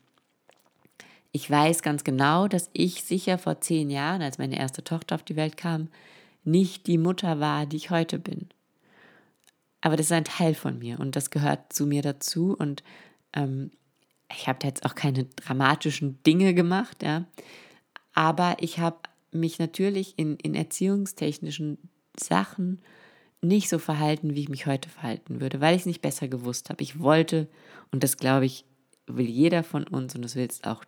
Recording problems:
none

